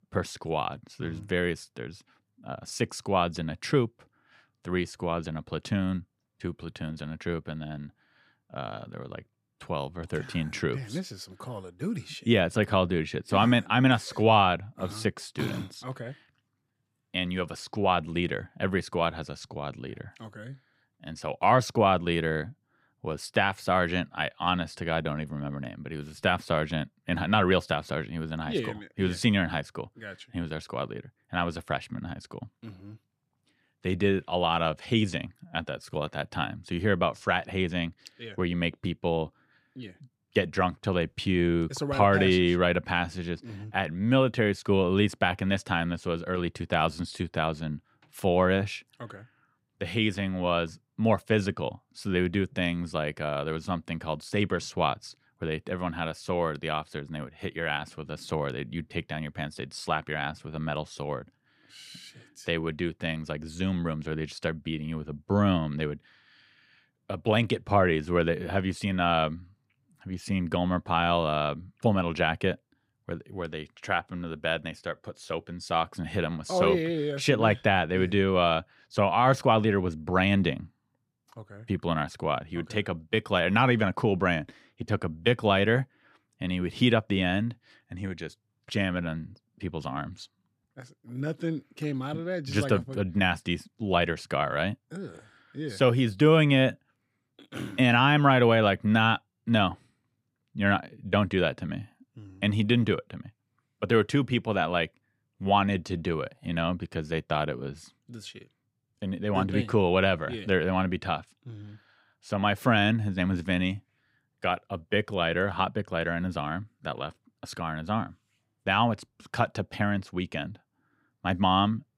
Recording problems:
none

